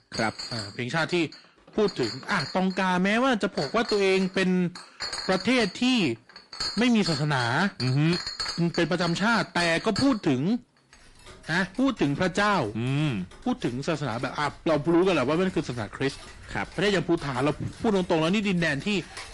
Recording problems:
distortion; heavy; 7 dB below the speech
garbled, watery; slightly
household noises; noticeable; throughout; 10 dB below the speech

